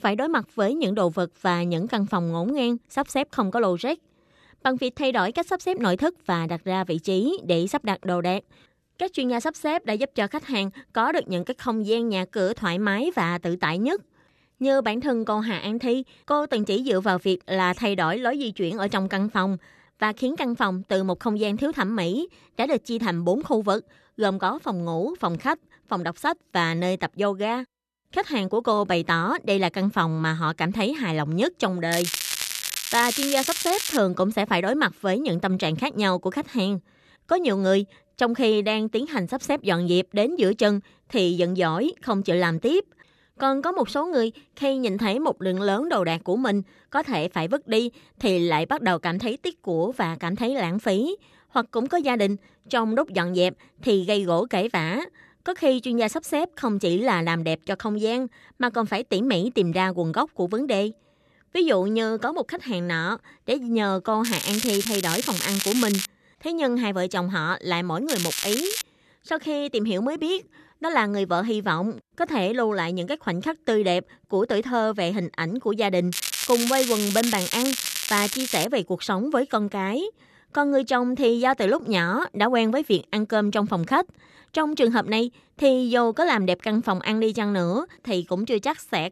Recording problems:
crackling; loud; 4 times, first at 32 s; 2 dB below the speech

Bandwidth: 13.5 kHz